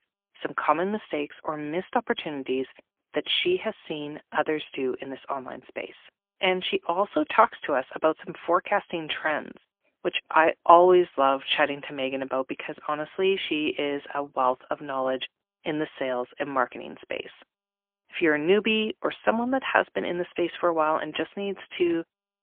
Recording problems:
phone-call audio; poor line; nothing above 3.5 kHz

